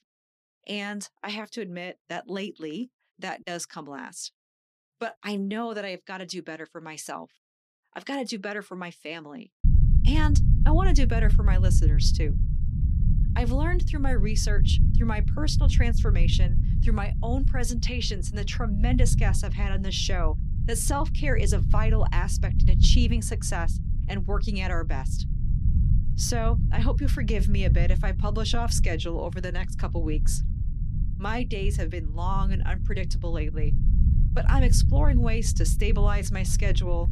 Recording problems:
low rumble; loud; from 9.5 s on; 9 dB below the speech

